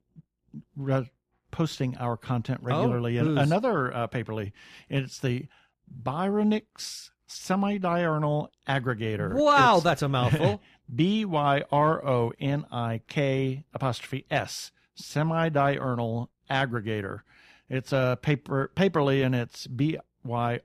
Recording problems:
none

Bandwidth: 14.5 kHz